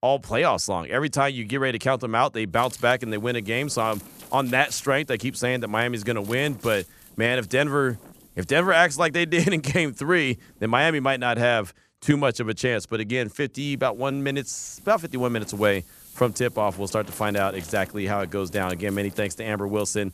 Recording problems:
wind noise on the microphone; occasional gusts; from 2.5 to 11 s and from 14 s on; 25 dB below the speech

